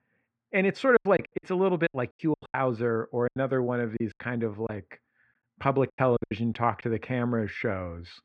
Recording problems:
muffled; very; fading above 2 kHz
choppy; very; from 1 to 2.5 s and from 3.5 to 7 s; 16% of the speech affected

